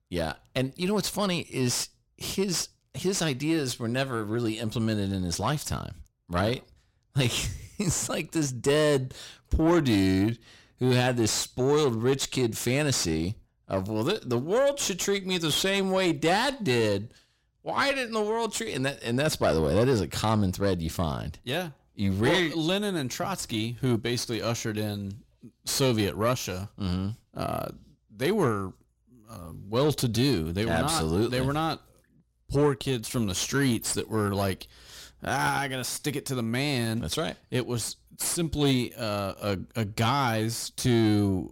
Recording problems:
distortion; slight; 10 dB below the speech

